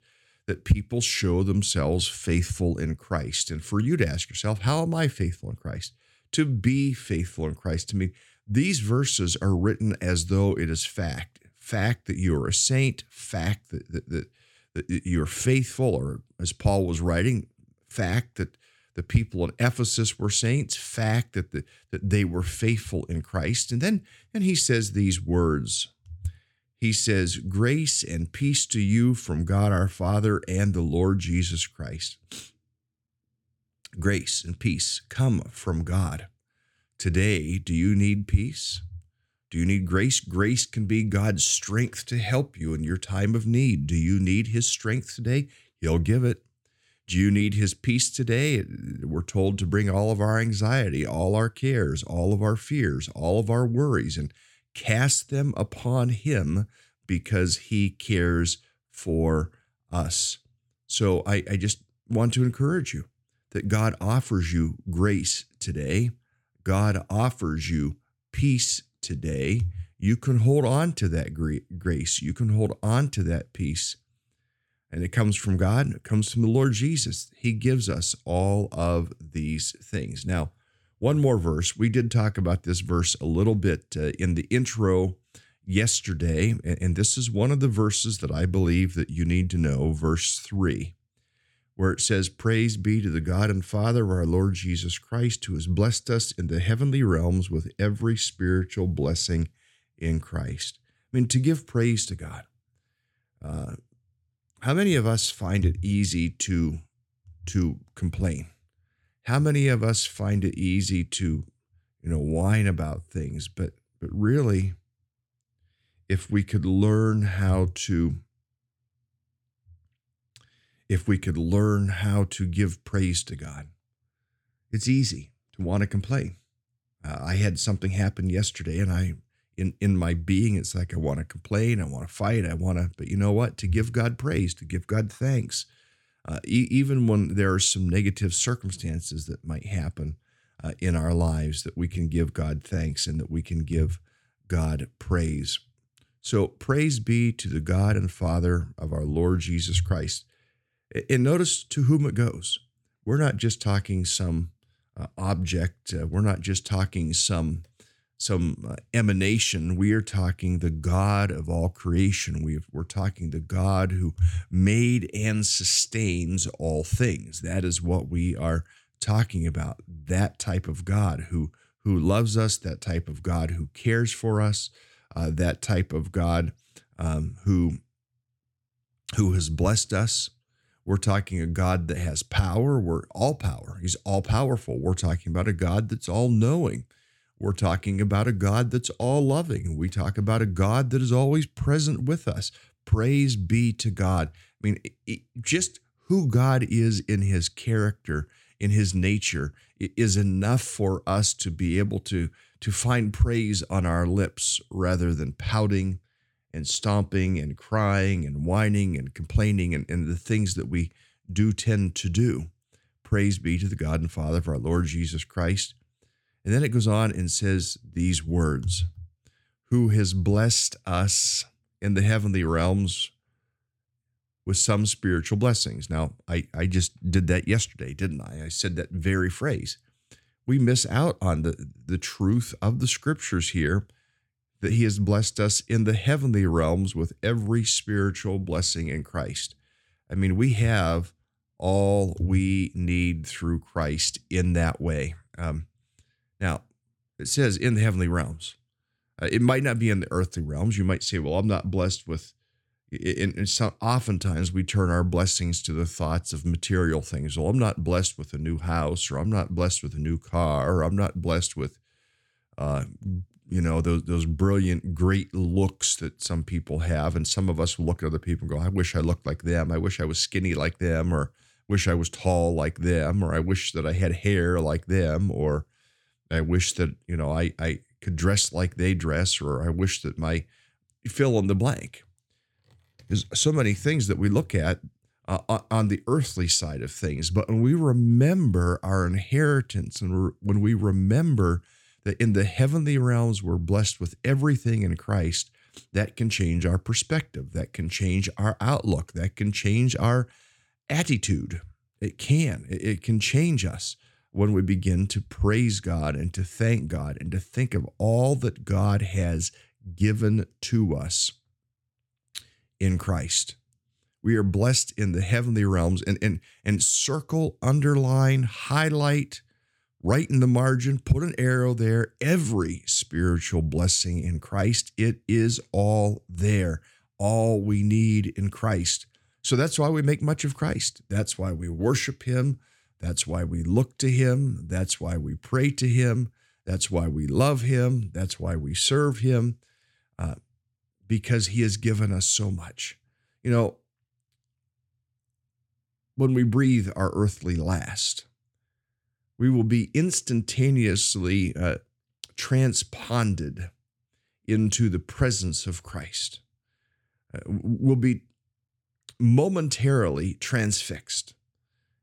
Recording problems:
none

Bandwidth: 17 kHz